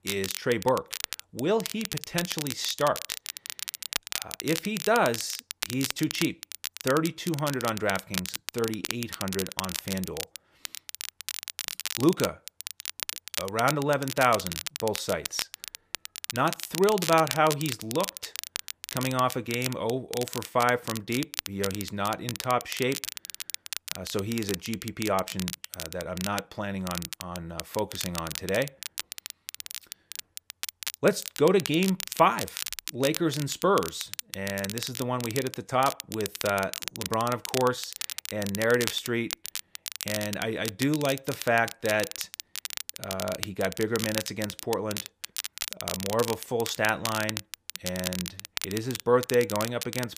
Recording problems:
crackle, like an old record; loud; 6 dB below the speech

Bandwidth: 15 kHz